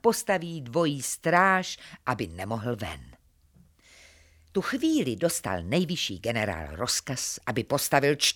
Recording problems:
none

